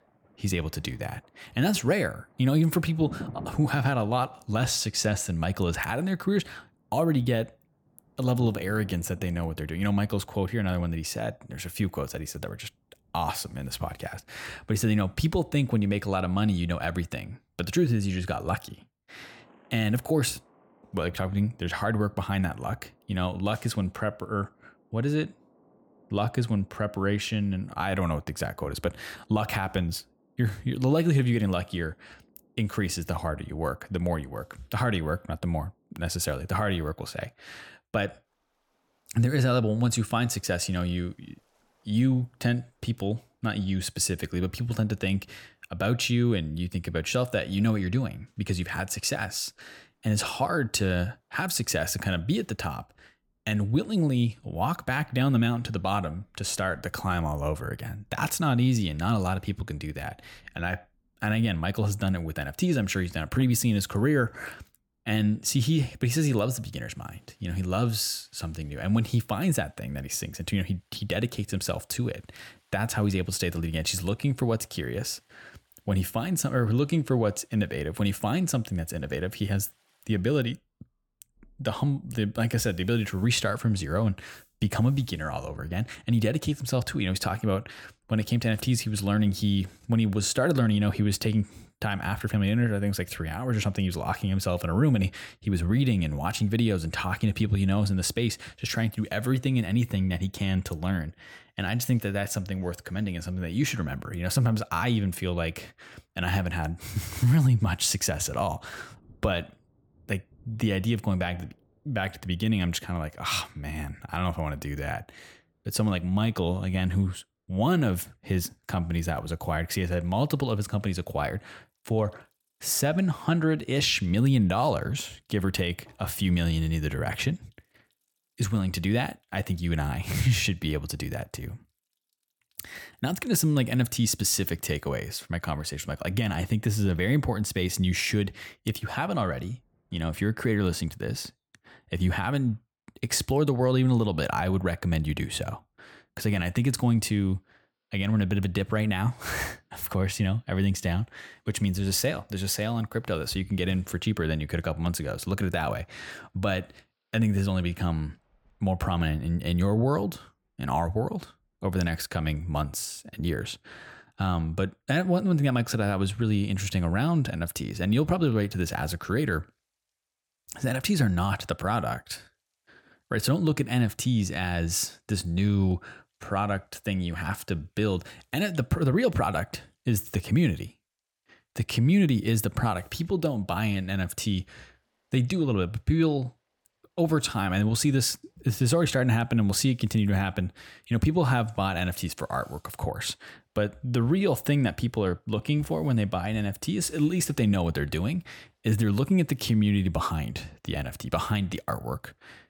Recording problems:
rain or running water; faint; throughout; 25 dB below the speech

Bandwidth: 18 kHz